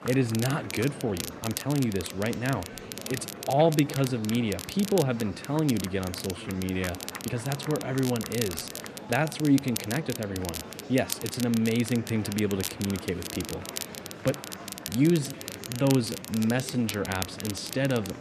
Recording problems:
crackle, like an old record; loud; 9 dB below the speech
murmuring crowd; noticeable; throughout; 15 dB below the speech
uneven, jittery; strongly; from 1 to 17 s

